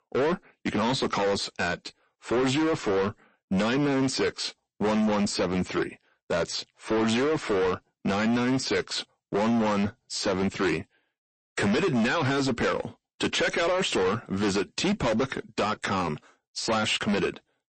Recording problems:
distortion; heavy; 19% of the sound clipped
garbled, watery; slightly; nothing above 8 kHz

